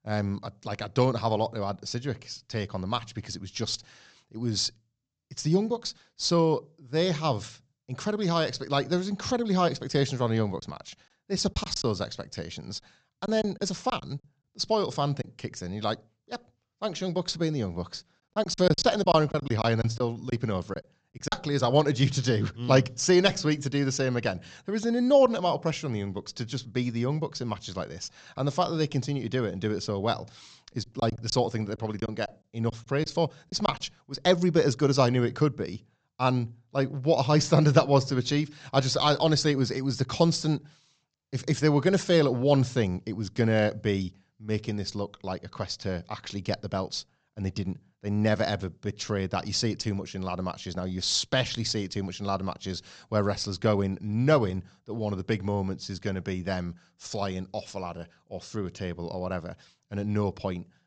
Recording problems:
high frequencies cut off; noticeable; nothing above 8 kHz
choppy; very; from 11 to 15 s, from 18 to 21 s and from 31 to 34 s; 10% of the speech affected

